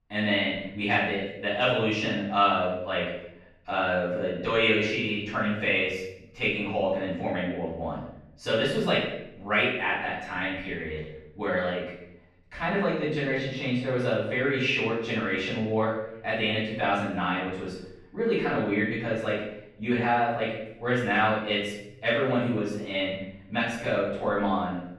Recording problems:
off-mic speech; far
room echo; noticeable; dies away in 0.7 s
muffled; slightly; fading above 3 kHz

